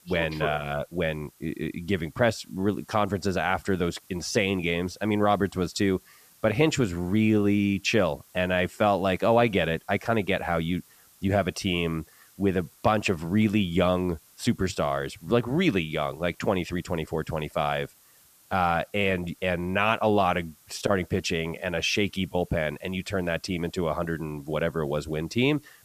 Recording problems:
hiss; faint; throughout; 30 dB below the speech

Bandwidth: 14.5 kHz